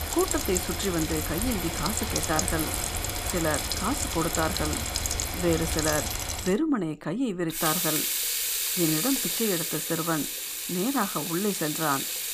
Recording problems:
household noises; very loud; throughout; 1 dB above the speech

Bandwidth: 15 kHz